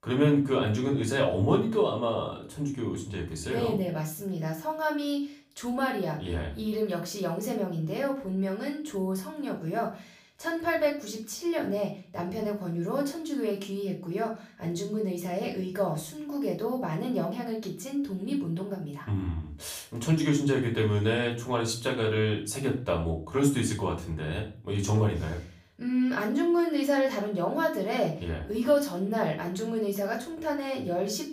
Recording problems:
off-mic speech; far
room echo; slight; dies away in 0.4 s

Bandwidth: 15 kHz